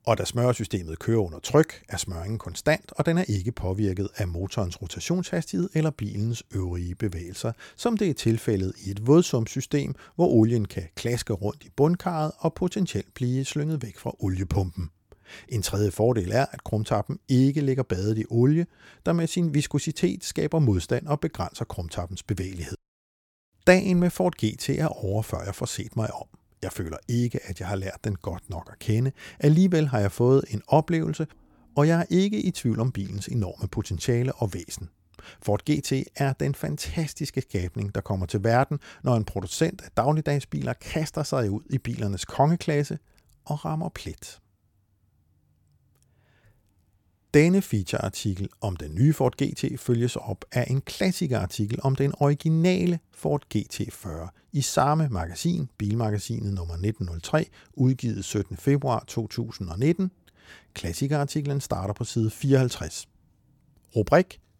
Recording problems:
none

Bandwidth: 17.5 kHz